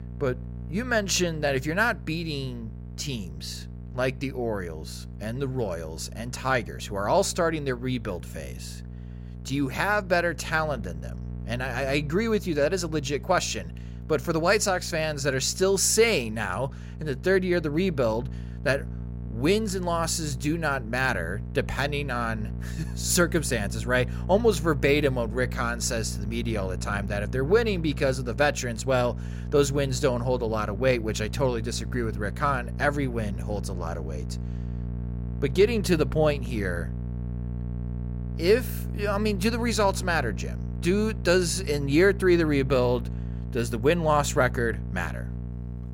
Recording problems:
electrical hum; faint; throughout; 60 Hz, 20 dB below the speech

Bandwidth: 16 kHz